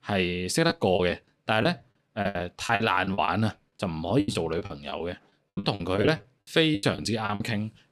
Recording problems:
choppy; very; 17% of the speech affected

